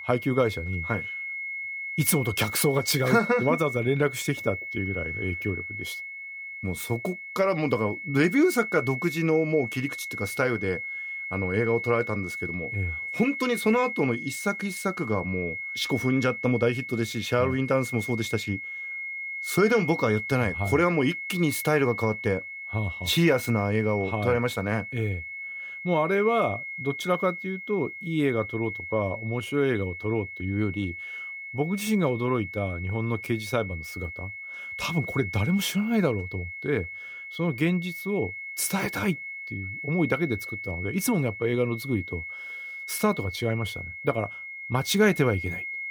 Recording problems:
high-pitched whine; loud; throughout; 2 kHz, 7 dB below the speech

